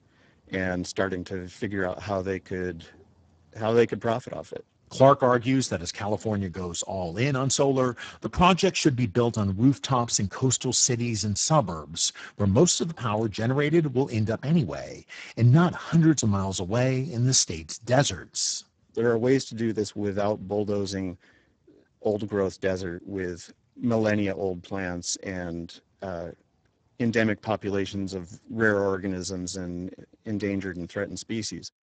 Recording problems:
garbled, watery; badly; nothing above 7.5 kHz

